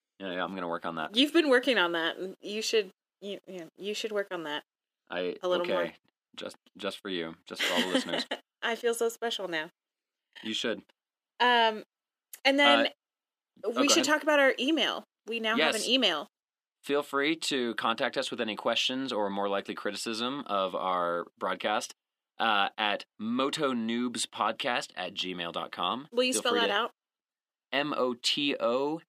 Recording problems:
thin; very slightly; fading below 300 Hz

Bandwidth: 15 kHz